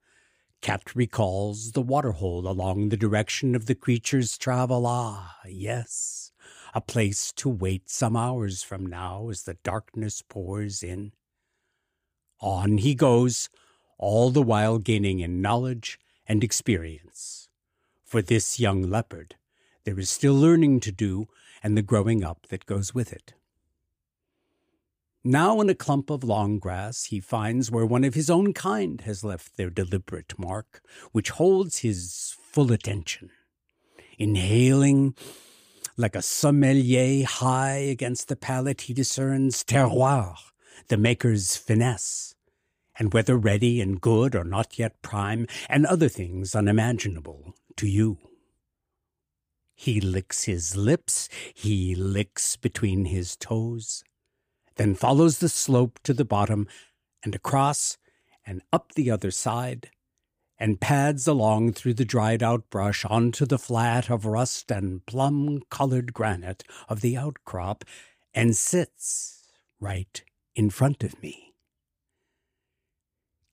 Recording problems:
none

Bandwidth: 15 kHz